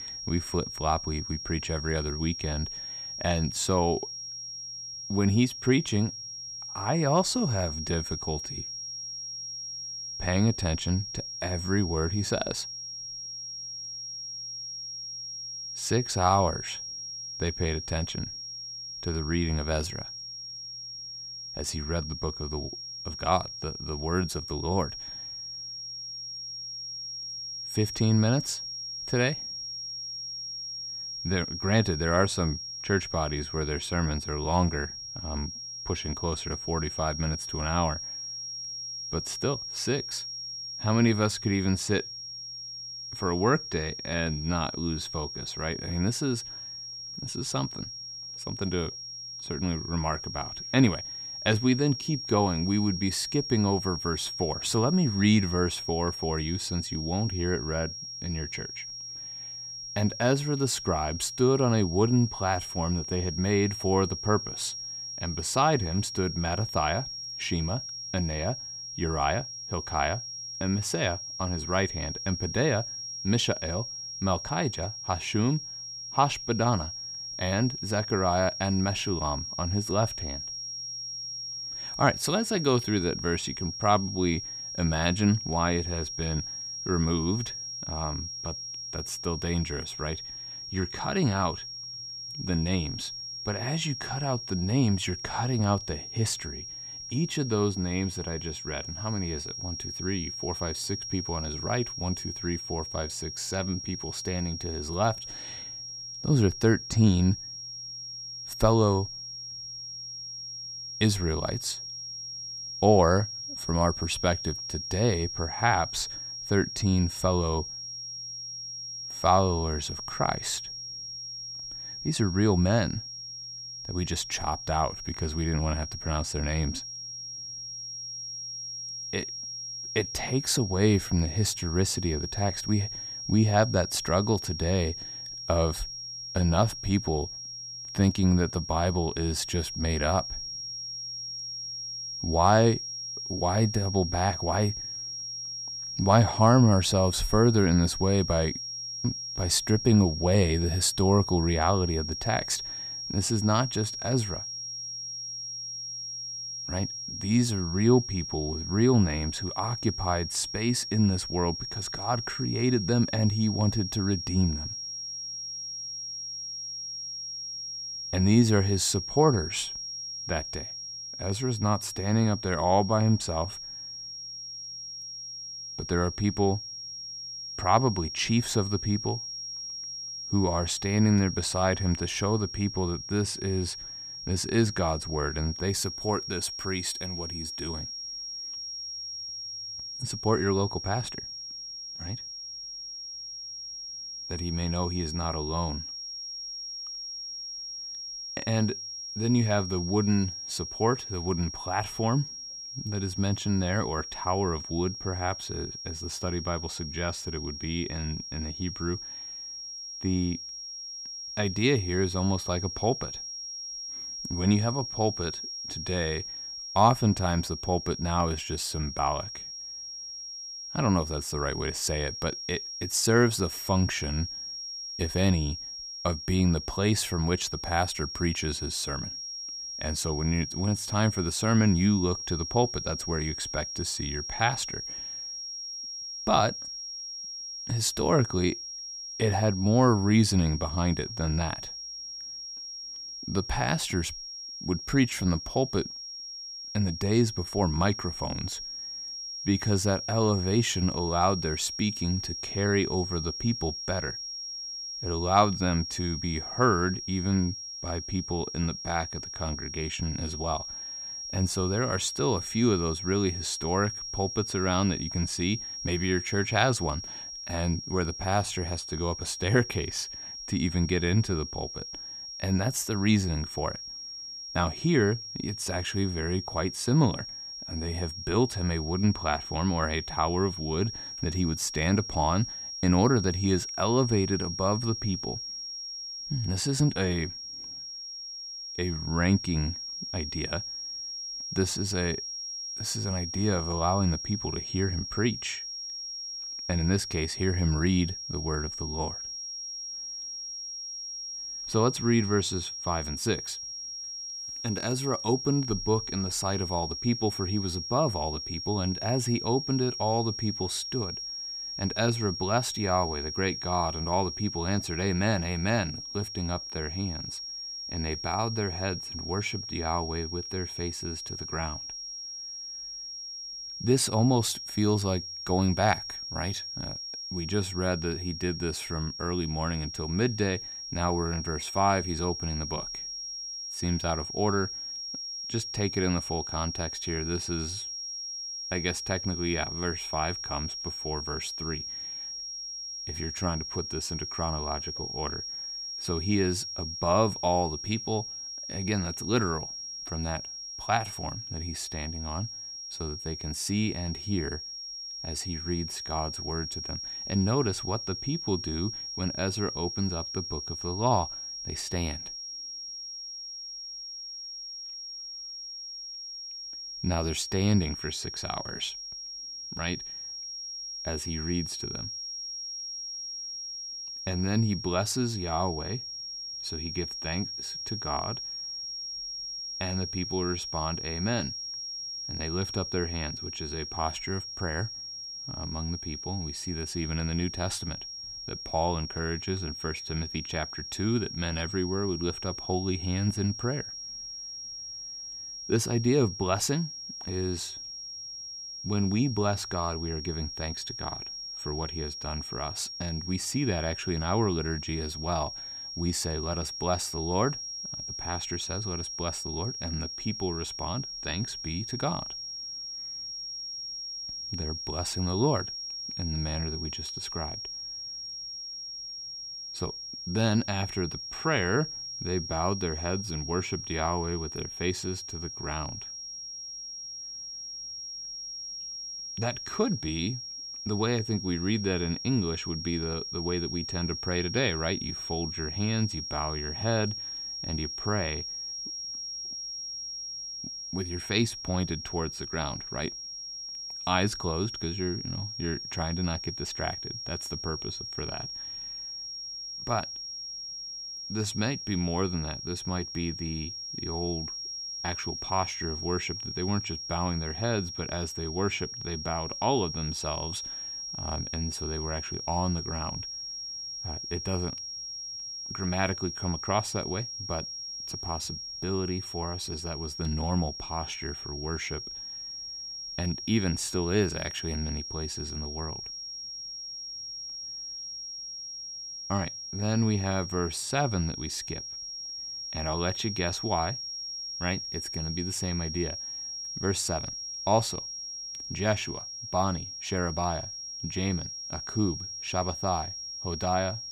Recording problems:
high-pitched whine; loud; throughout; 5.5 kHz, 6 dB below the speech

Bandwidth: 14.5 kHz